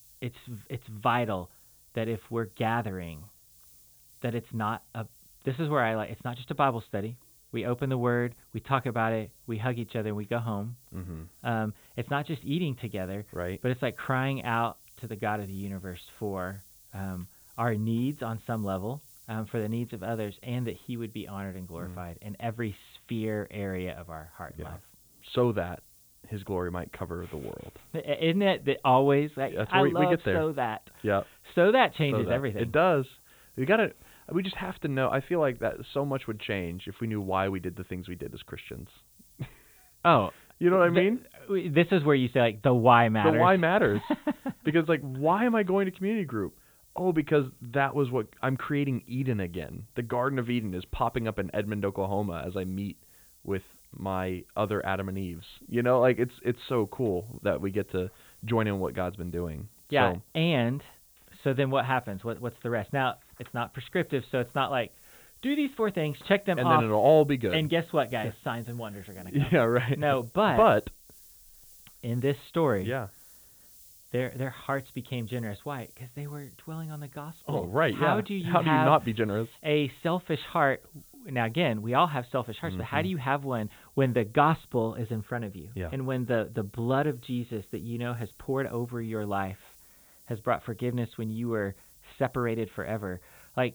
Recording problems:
high frequencies cut off; severe; nothing above 4 kHz
hiss; faint; throughout; 25 dB below the speech

